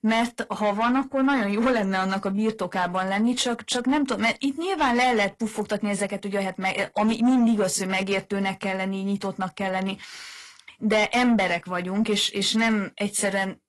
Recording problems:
distortion; slight; 10 dB below the speech
garbled, watery; slightly; nothing above 11 kHz

